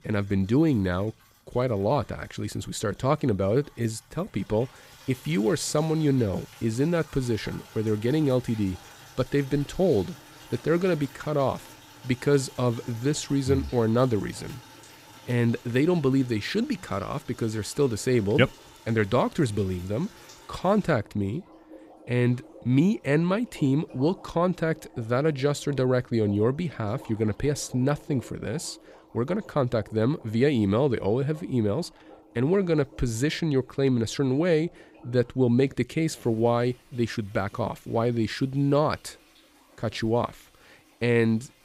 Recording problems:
household noises; faint; throughout; 25 dB below the speech

